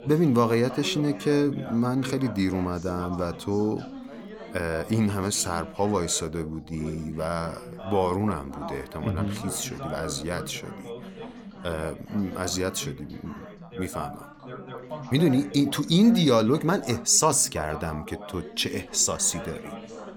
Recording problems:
background chatter; noticeable; throughout; 3 voices, 15 dB below the speech

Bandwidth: 17 kHz